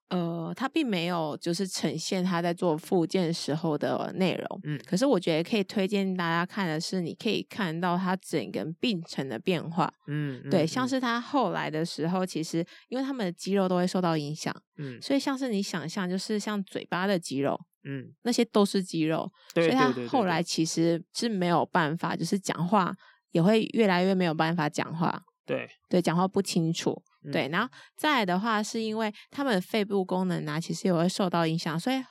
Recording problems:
none

